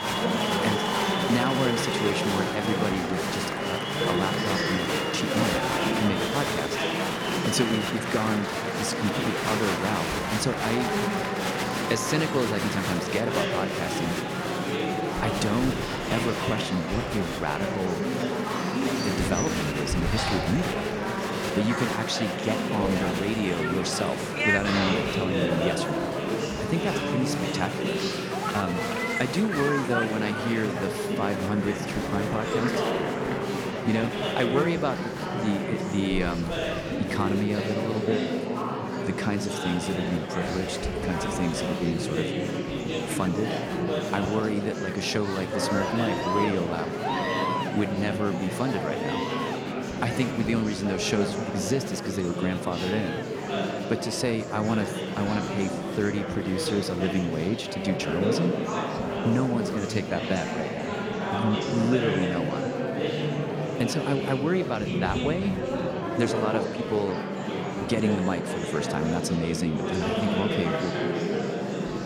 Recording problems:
murmuring crowd; very loud; throughout; 1 dB above the speech

